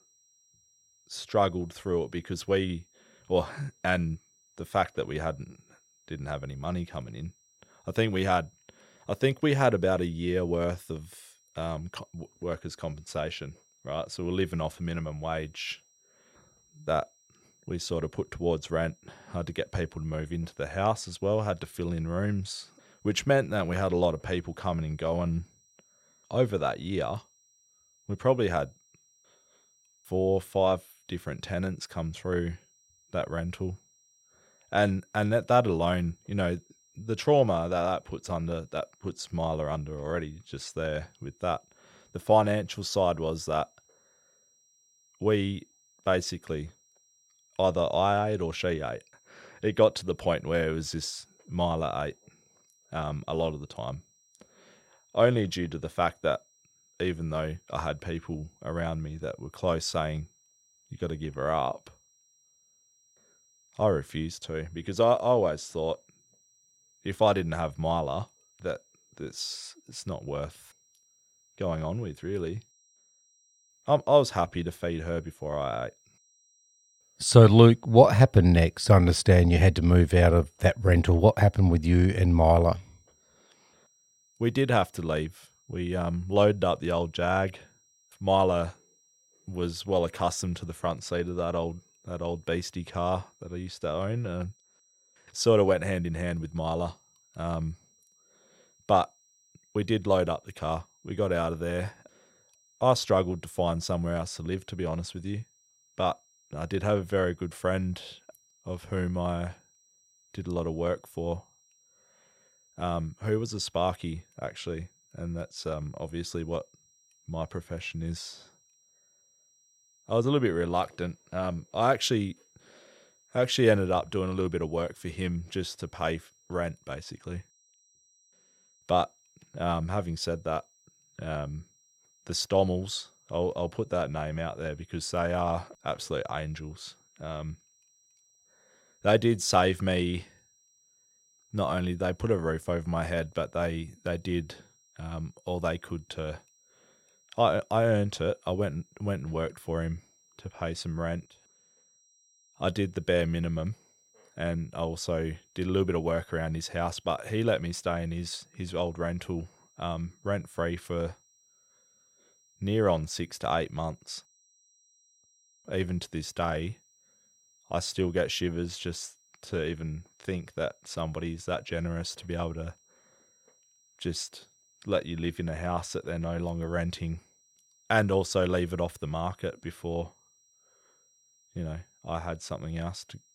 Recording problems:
high-pitched whine; faint; throughout; 5.5 kHz, 35 dB below the speech

